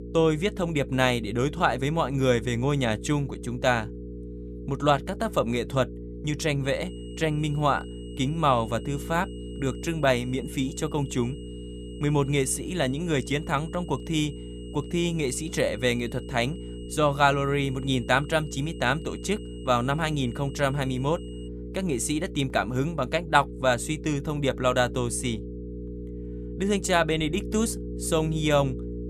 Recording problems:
electrical hum; noticeable; throughout; 60 Hz, 15 dB below the speech
high-pitched whine; faint; from 6.5 to 21 s; 3 kHz, 25 dB below the speech

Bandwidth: 14 kHz